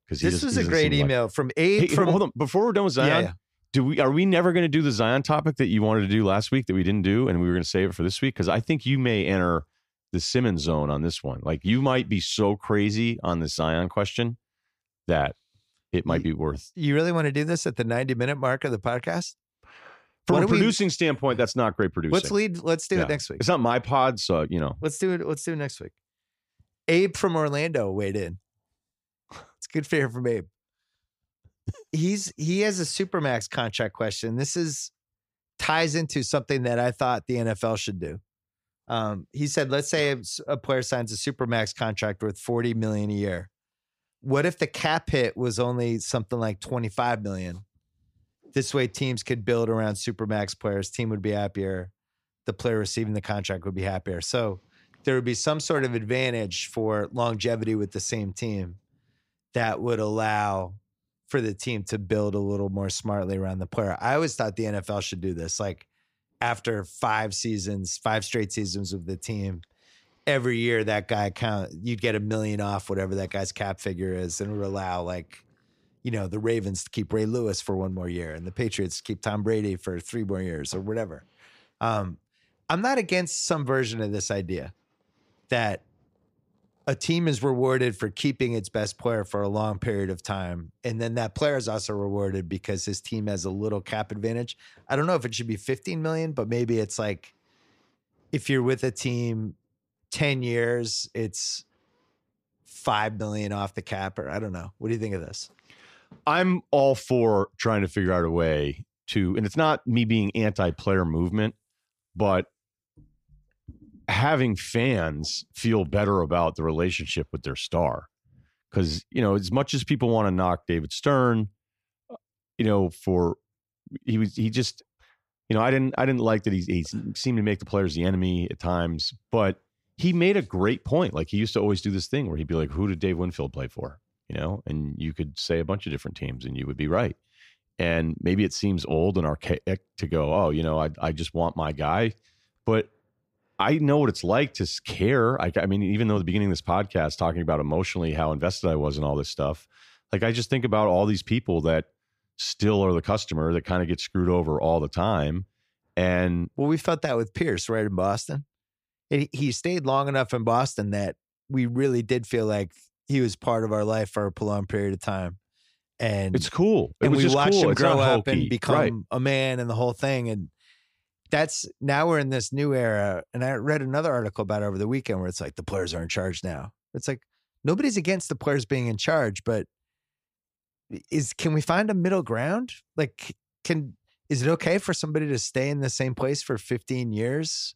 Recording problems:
none

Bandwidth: 15 kHz